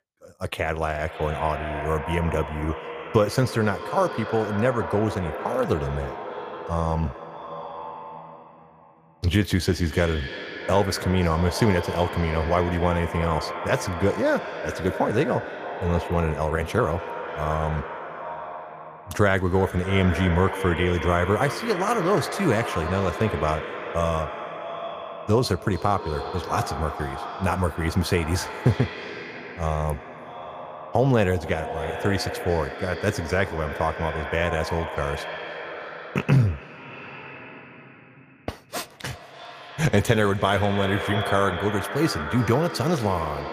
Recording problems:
echo of what is said; strong; throughout; 290 ms later, 8 dB below the speech

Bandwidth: 15 kHz